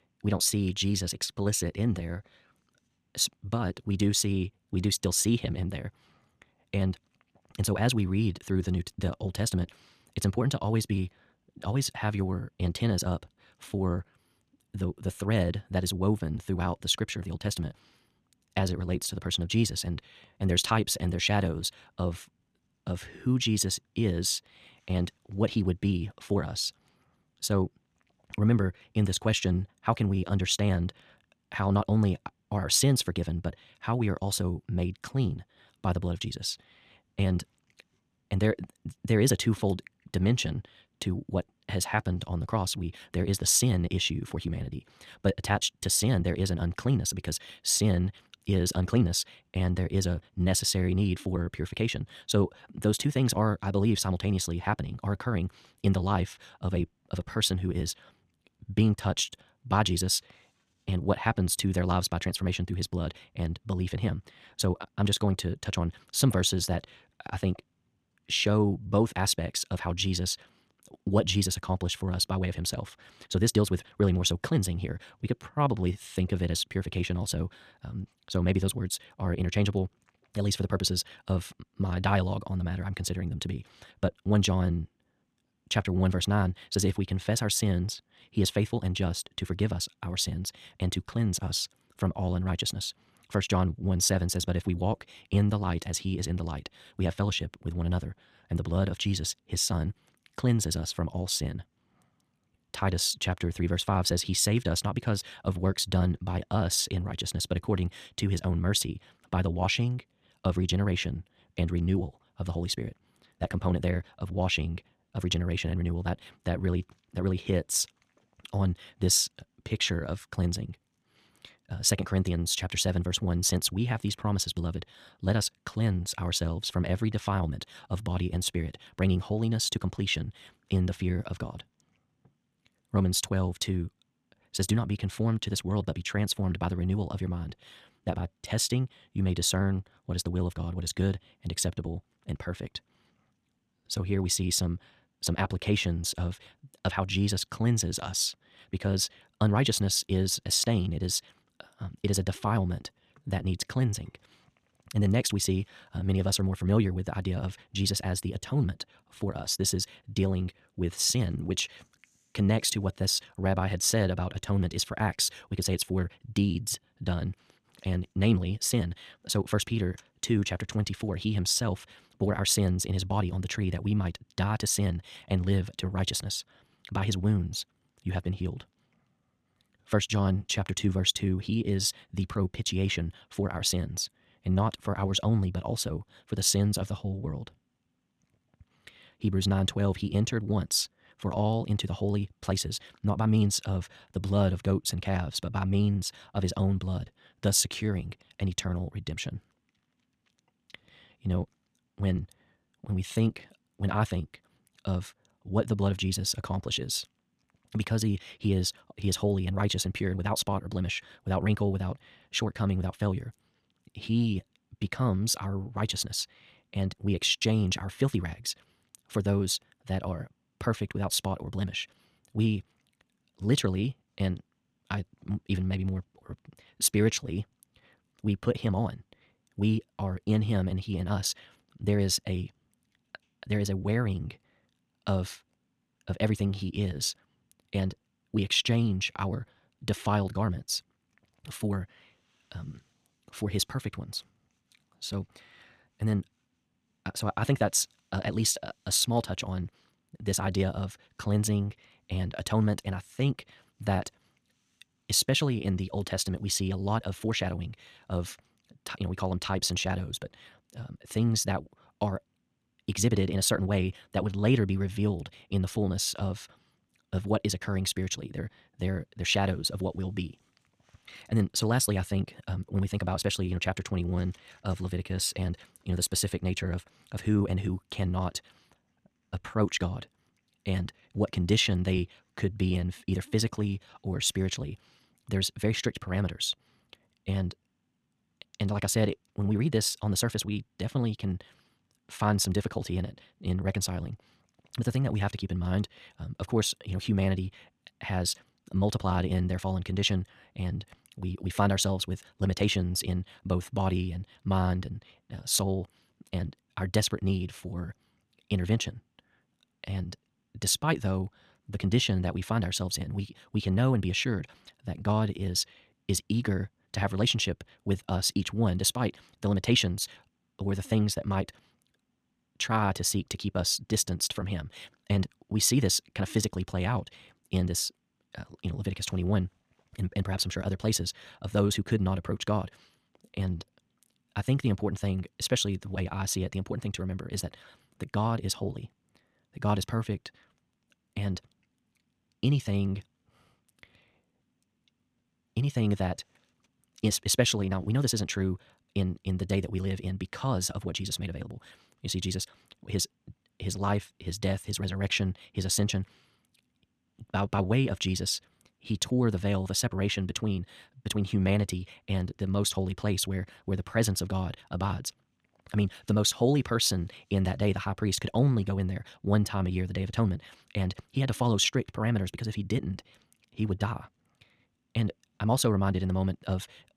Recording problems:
wrong speed, natural pitch; too fast; 1.7 times normal speed

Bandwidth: 14 kHz